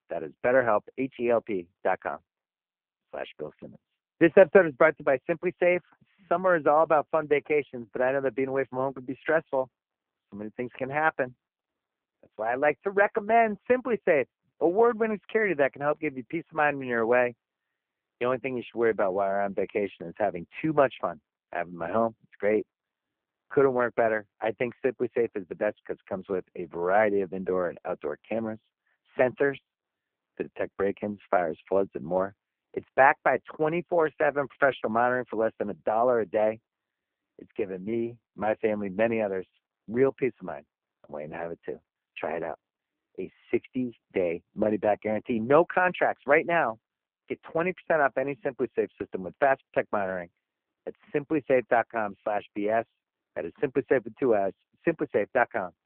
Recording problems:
phone-call audio; poor line

